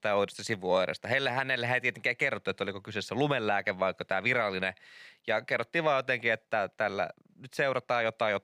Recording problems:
none

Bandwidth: 15 kHz